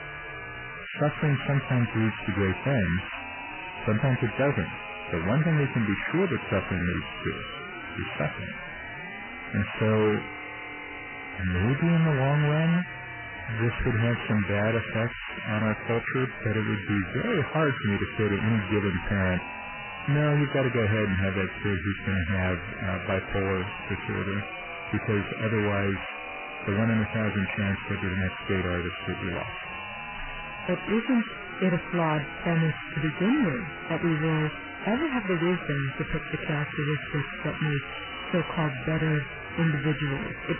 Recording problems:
distortion; heavy; 98% of the sound clipped
garbled, watery; badly; nothing above 3 kHz
high-pitched whine; loud; throughout; 500 Hz, 1 dB below the speech
crackling; noticeable; from 14 to 16 s and from 36 to 38 s; 15 dB below the speech

